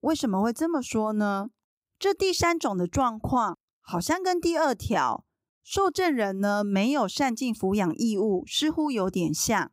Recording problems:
none

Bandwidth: 15.5 kHz